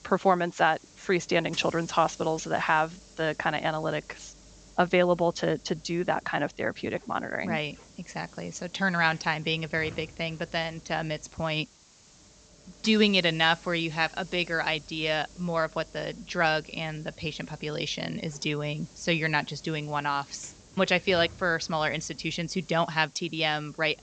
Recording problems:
high frequencies cut off; noticeable; nothing above 8 kHz
hiss; faint; throughout; 25 dB below the speech

